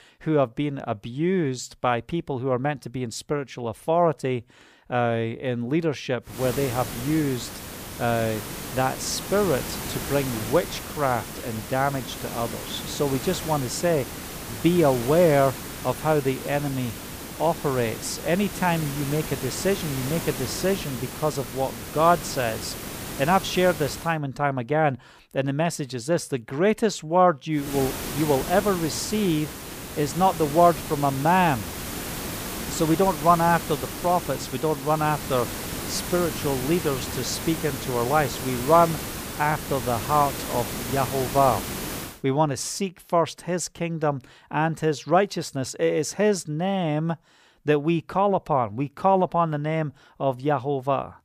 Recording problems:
hiss; loud; from 6.5 to 24 s and from 28 to 42 s; 8 dB below the speech

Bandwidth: 15 kHz